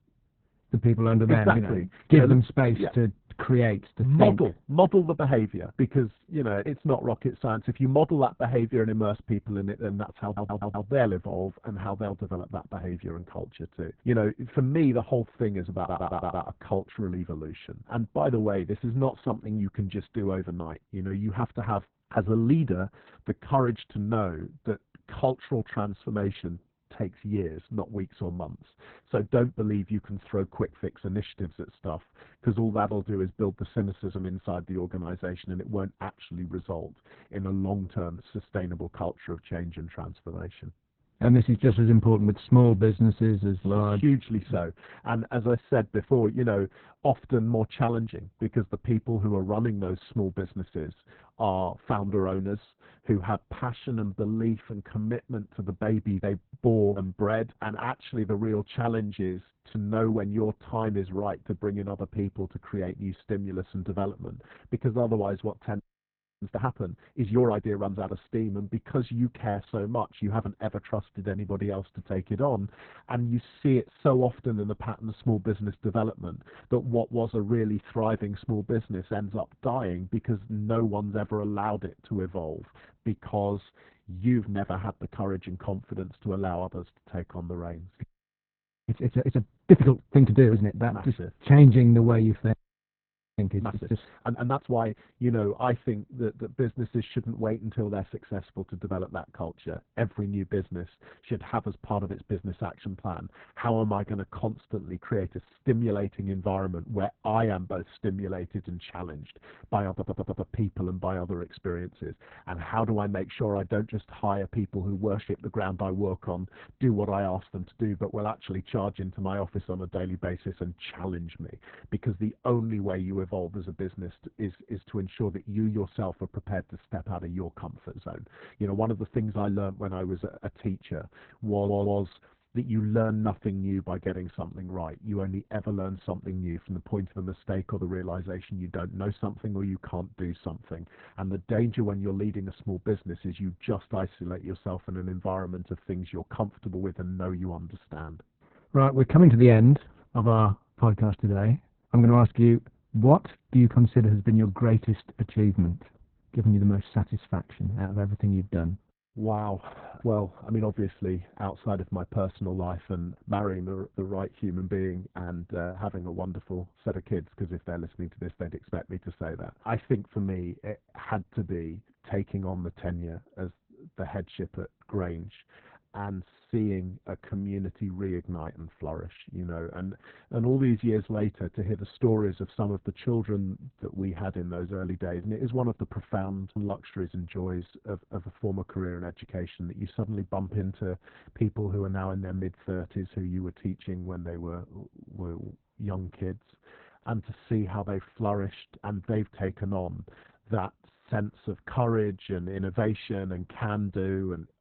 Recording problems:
garbled, watery; badly; nothing above 4 kHz
muffled; very slightly; fading above 2.5 kHz
audio stuttering; 4 times, first at 10 s
audio freezing; at 1:06 for 0.5 s, at 1:28 for 1 s and at 1:33 for 1 s

